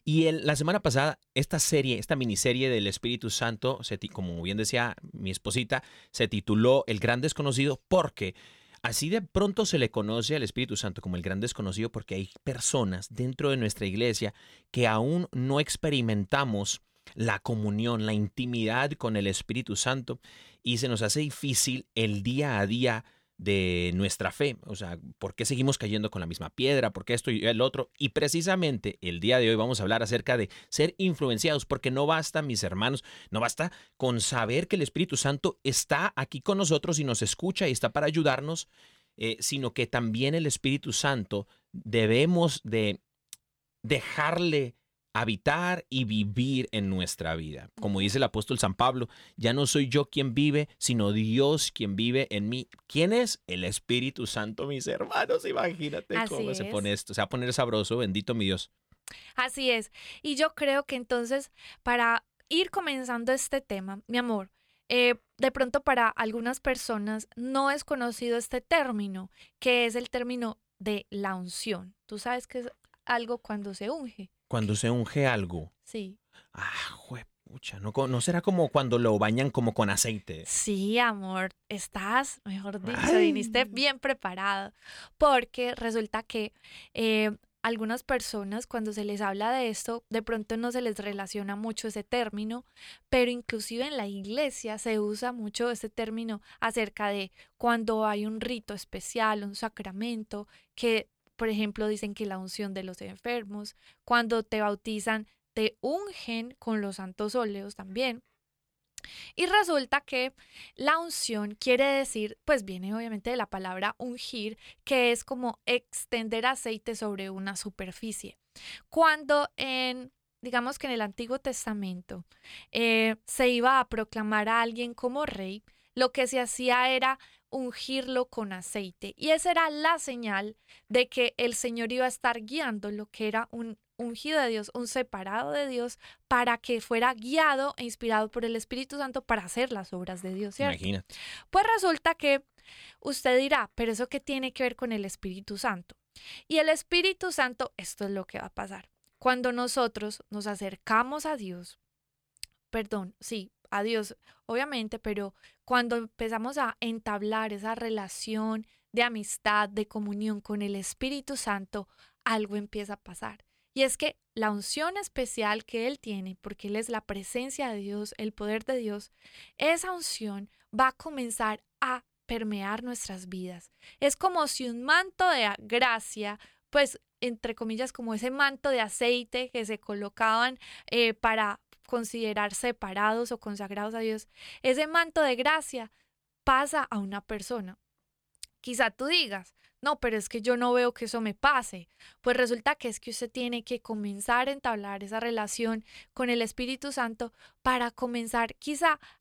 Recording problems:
none

